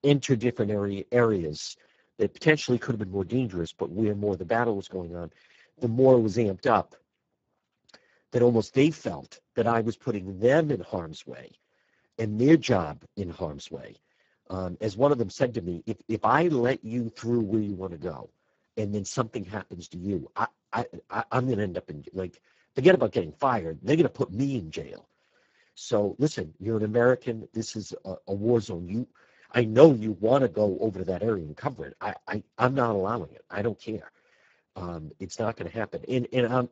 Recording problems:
garbled, watery; badly; nothing above 7.5 kHz
high frequencies cut off; slight

